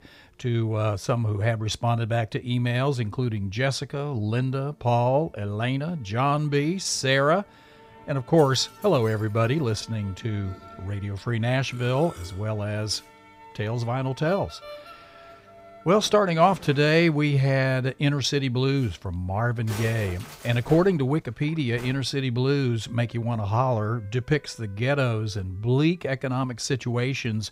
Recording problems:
background music; faint; throughout; 20 dB below the speech

